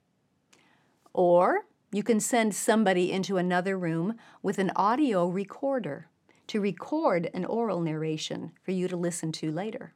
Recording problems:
none

